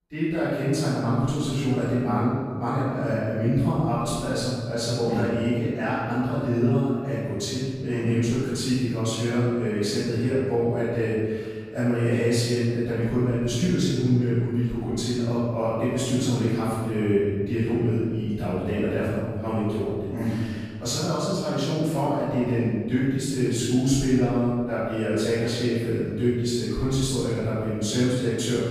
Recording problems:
room echo; strong; dies away in 1.6 s
off-mic speech; far

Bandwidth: 15 kHz